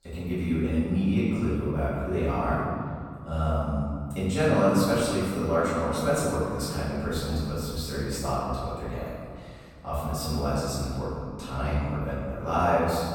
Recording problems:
room echo; strong; dies away in 2 s
off-mic speech; far

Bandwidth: 18 kHz